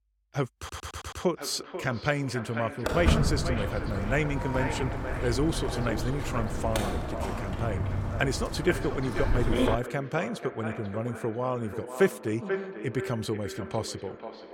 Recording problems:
echo of what is said; strong; throughout; 490 ms later, 8 dB below the speech
audio stuttering; at 0.5 s
footsteps; loud; from 3 to 10 s; peak 6 dB above the speech

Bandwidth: 17 kHz